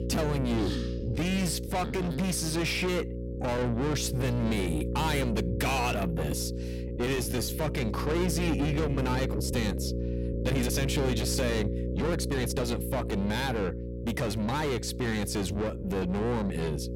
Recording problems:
distortion; heavy; 6 dB below the speech
electrical hum; loud; throughout; 60 Hz, 8 dB below the speech
uneven, jittery; strongly; from 1 to 16 s

